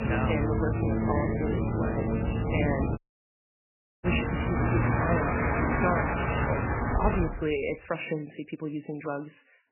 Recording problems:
garbled, watery; badly; nothing above 3 kHz
train or aircraft noise; very loud; until 7 s; 5 dB above the speech
uneven, jittery; strongly; from 1 to 9 s
audio cutting out; at 3 s for 1 s

